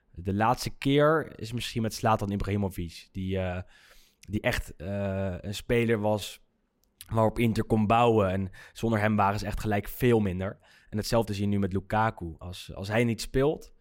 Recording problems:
uneven, jittery; strongly; from 1 to 13 s

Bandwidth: 16 kHz